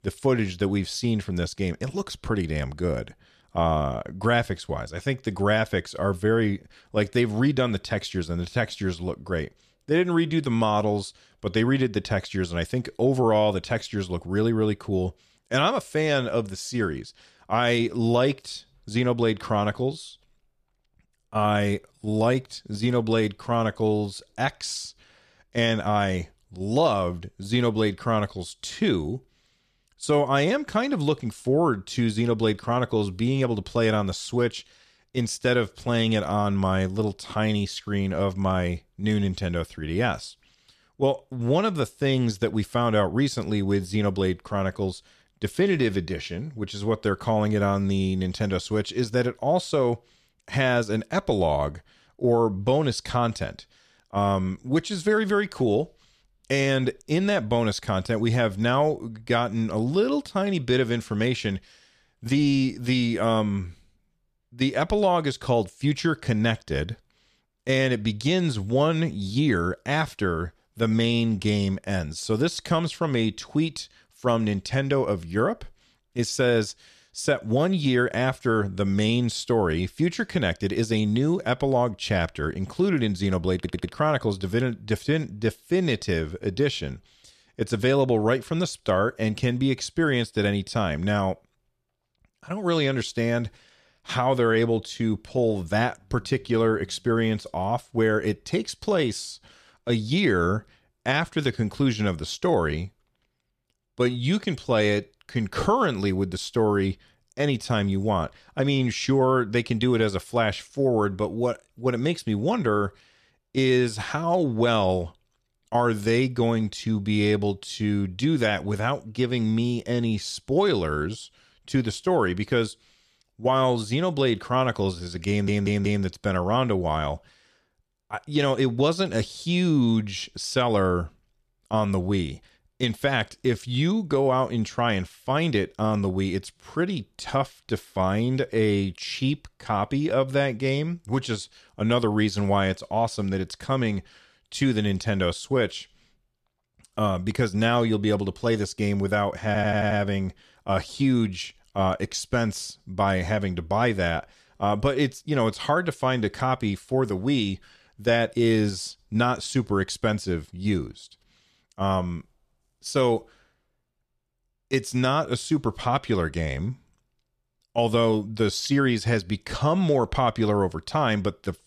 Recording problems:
audio stuttering; at 1:24, at 2:05 and at 2:29

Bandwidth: 14.5 kHz